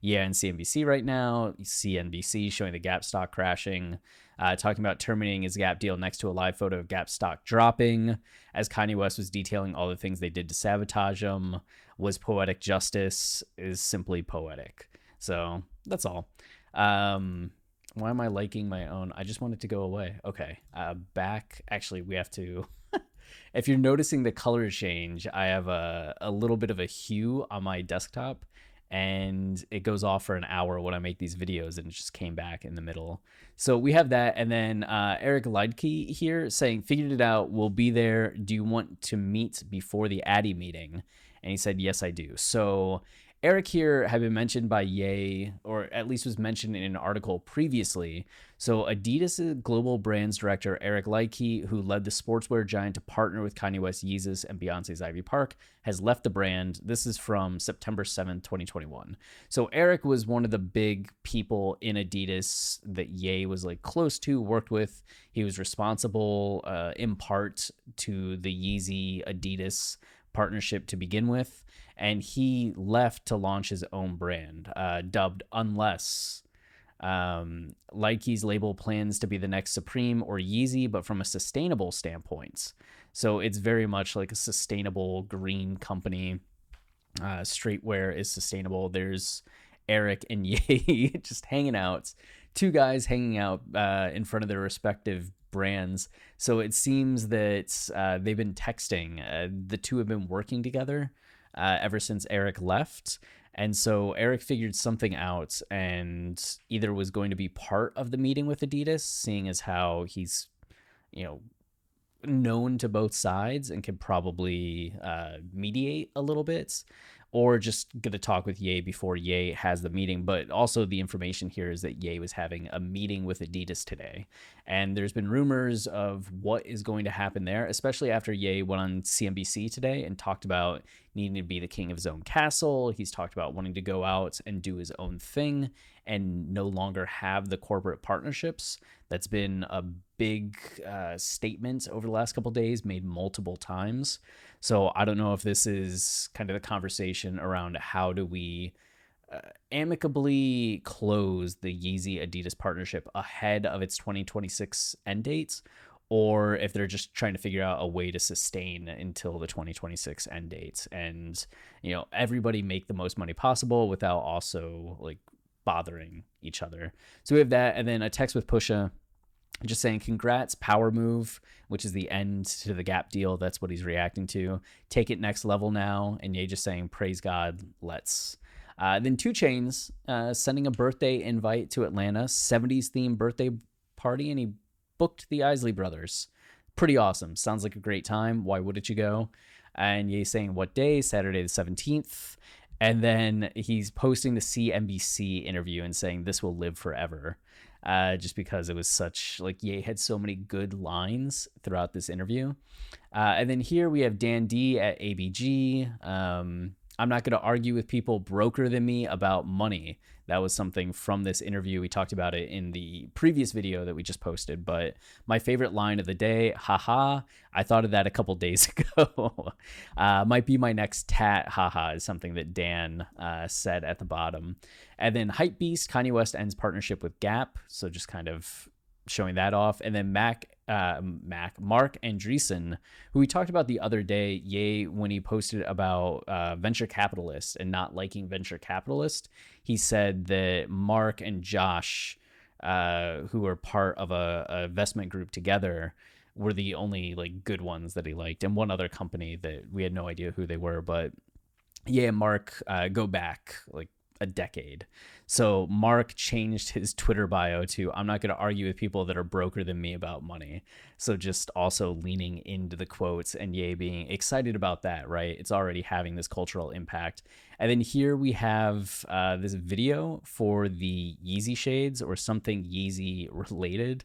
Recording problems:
none

